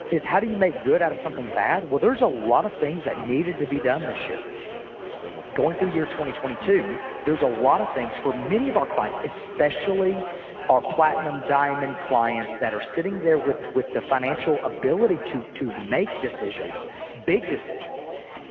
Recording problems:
phone-call audio; poor line; nothing above 6.5 kHz
echo of what is said; strong; from 4 s on; 150 ms later, 10 dB below the speech
garbled, watery; slightly
chatter from many people; noticeable; throughout; 10 dB below the speech

